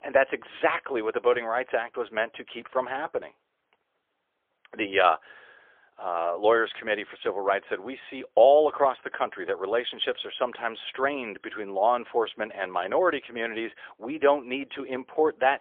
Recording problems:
phone-call audio; poor line; nothing above 3.5 kHz

